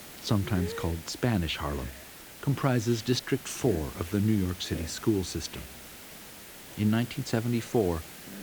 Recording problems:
hiss; noticeable; throughout; 15 dB below the speech

